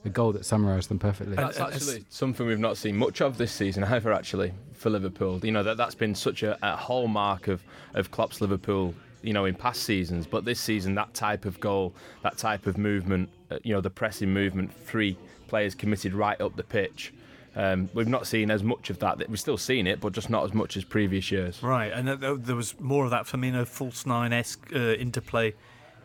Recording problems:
background chatter; faint; throughout; 3 voices, 25 dB below the speech

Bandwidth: 18 kHz